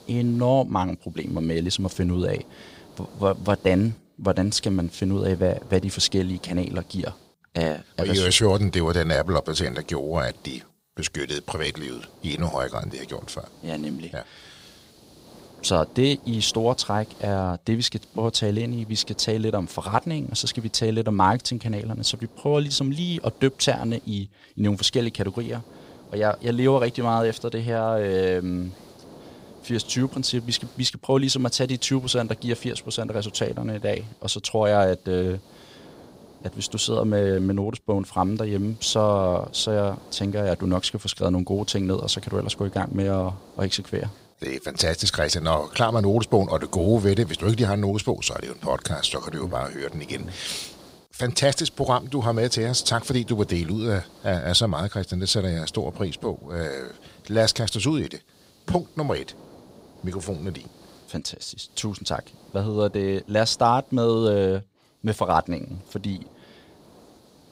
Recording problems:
hiss; faint; throughout; 25 dB below the speech

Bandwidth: 15.5 kHz